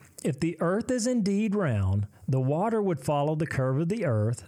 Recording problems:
squashed, flat; somewhat

